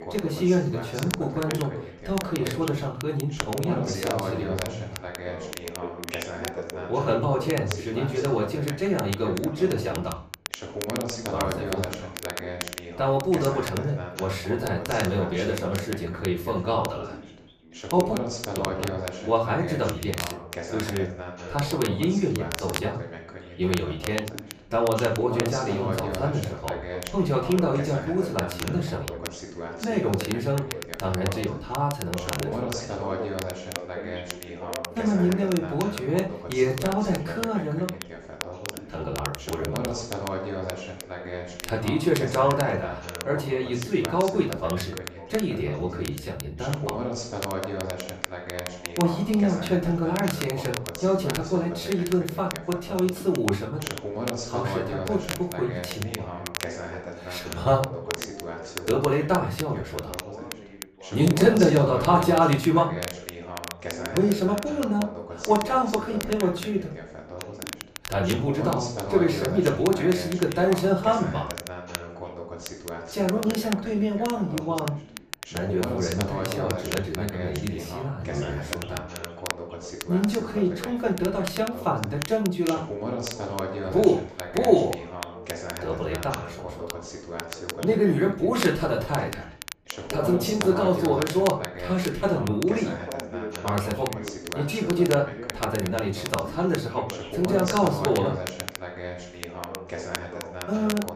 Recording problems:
off-mic speech; far
room echo; slight; dies away in 0.3 s
background chatter; loud; throughout; 2 voices, 9 dB below the speech
crackle, like an old record; noticeable; 10 dB below the speech

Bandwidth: 14.5 kHz